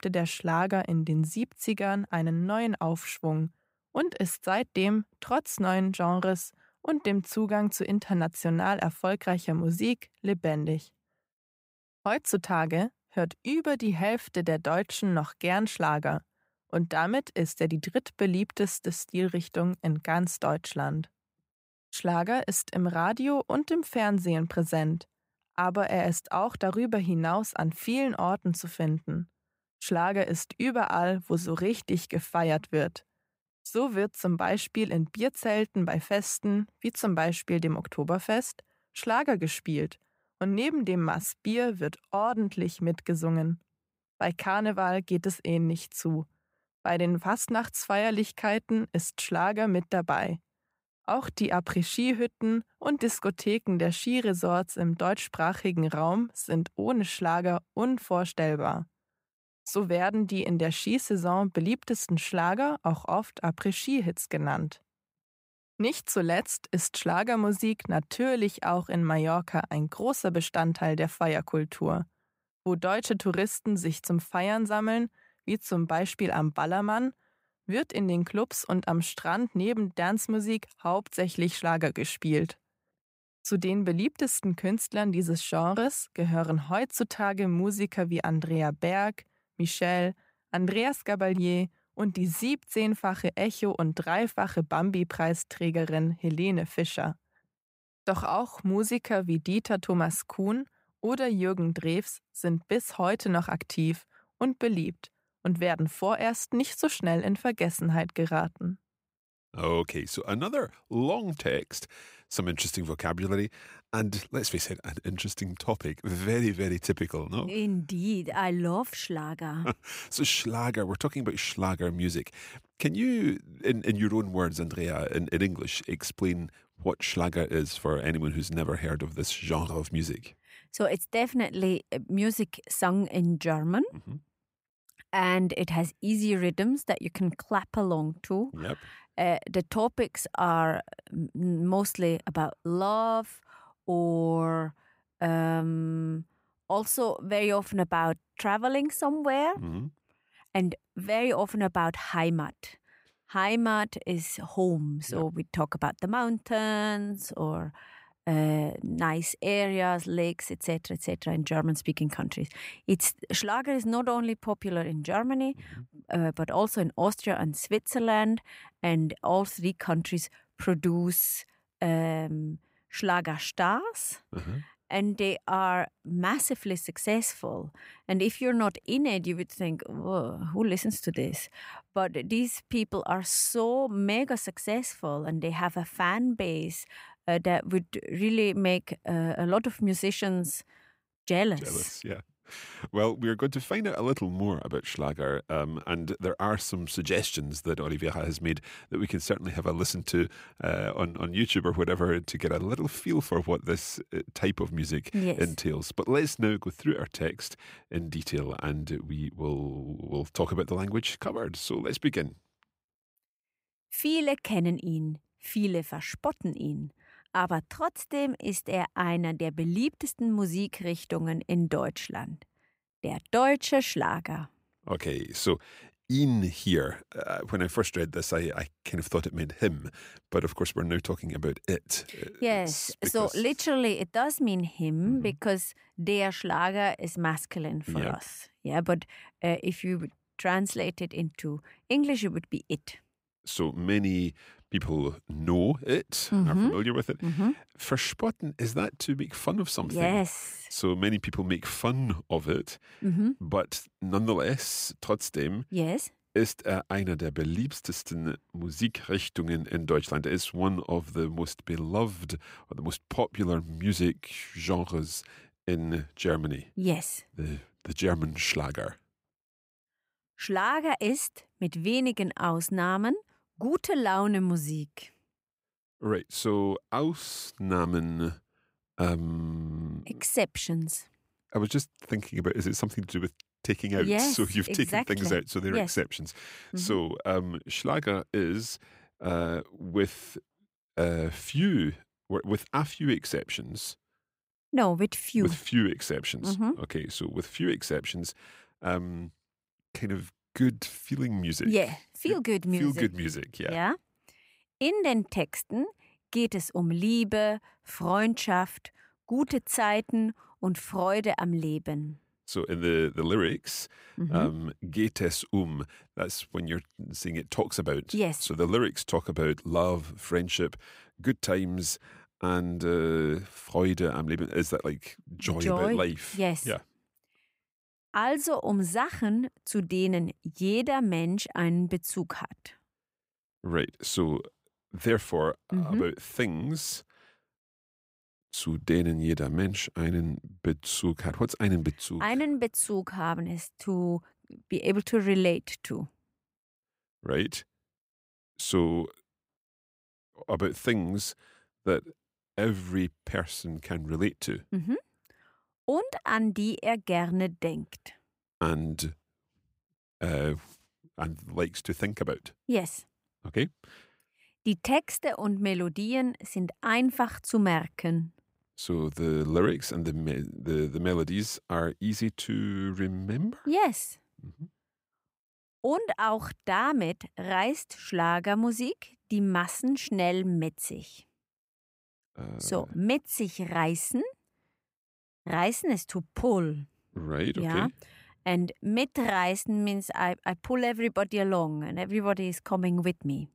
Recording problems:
none

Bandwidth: 15.5 kHz